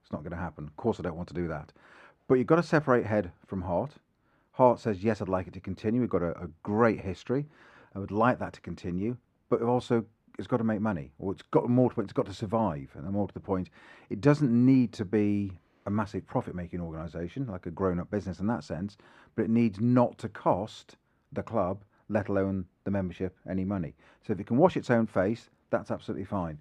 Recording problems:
muffled; very; fading above 3 kHz

